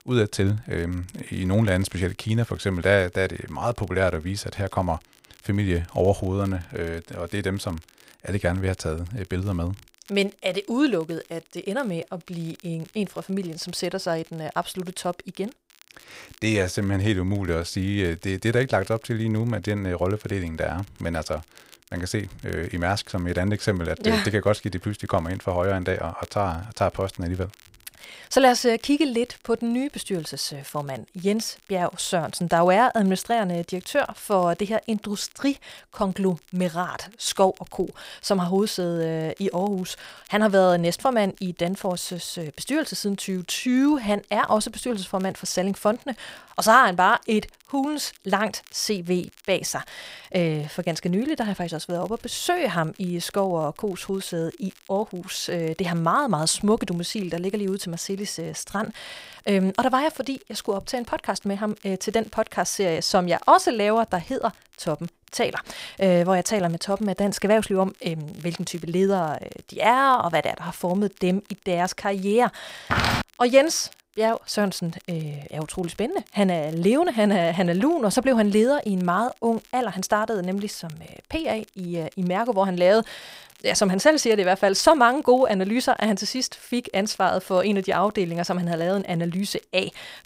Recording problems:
crackle, like an old record; faint; 30 dB below the speech
footsteps; loud; at 1:13; peak 2 dB above the speech

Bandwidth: 15.5 kHz